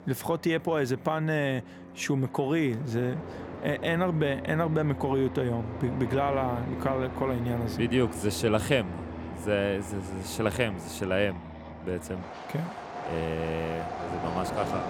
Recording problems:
train or aircraft noise; loud; throughout; 9 dB below the speech

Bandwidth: 18.5 kHz